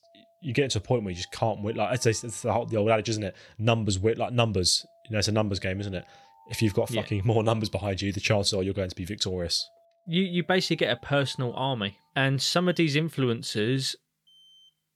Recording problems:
alarms or sirens; faint; throughout; 30 dB below the speech

